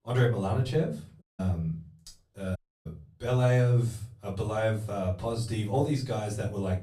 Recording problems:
off-mic speech; far
room echo; slight; dies away in 0.3 s
audio cutting out; at 1 s and at 2.5 s

